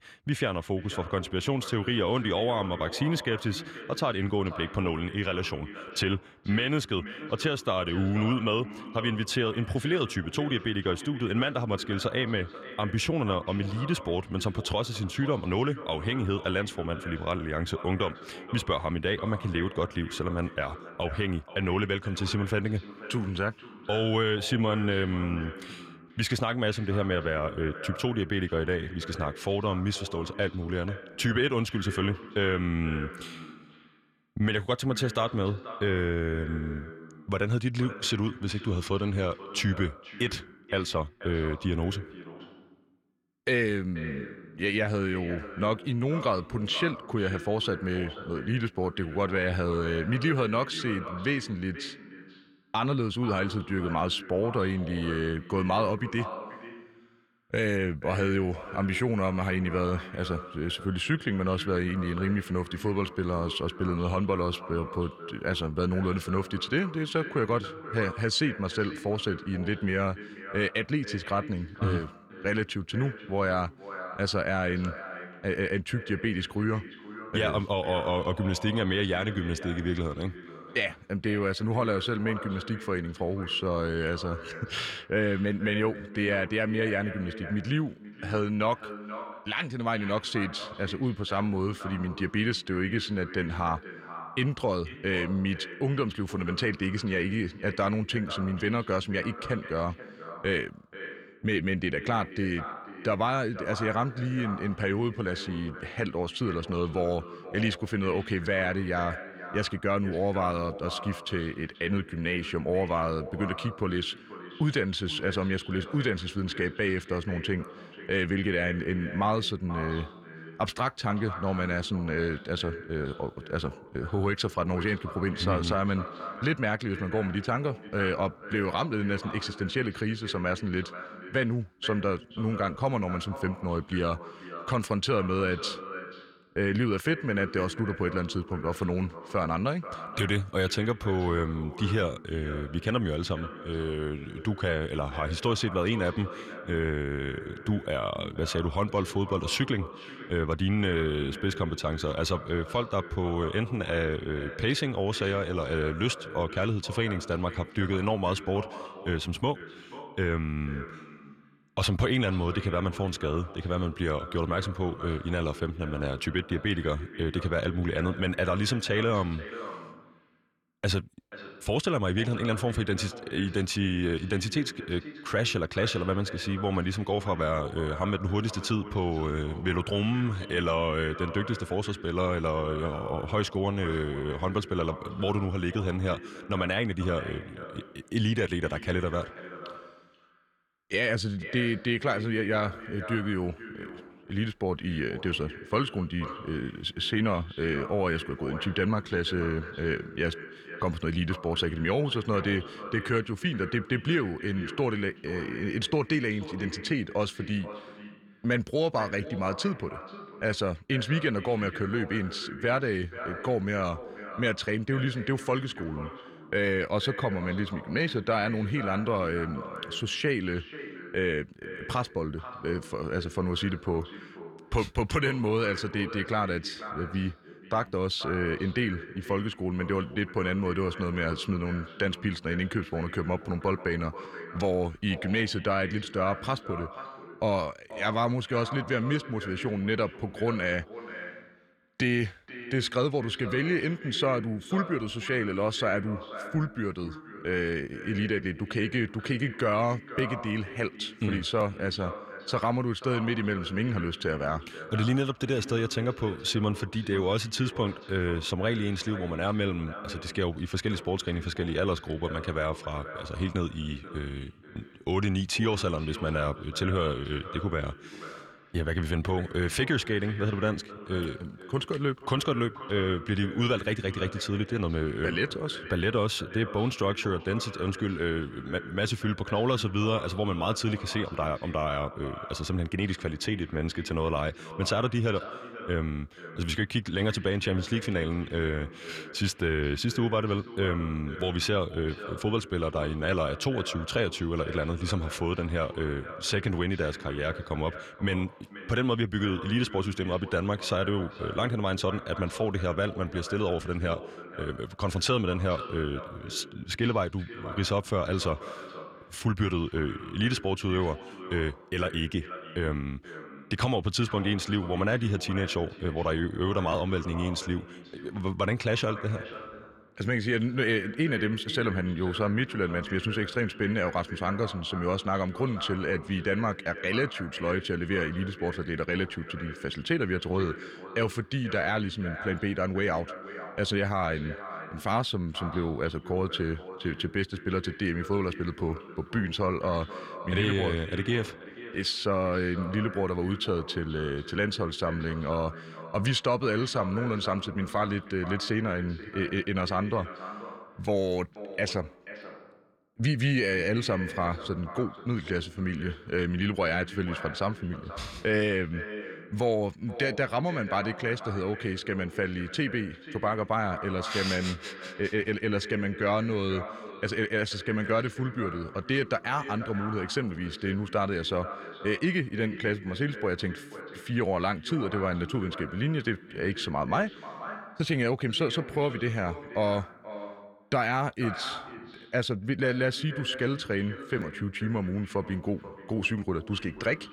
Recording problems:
echo of what is said; noticeable; throughout; 480 ms later, 15 dB below the speech

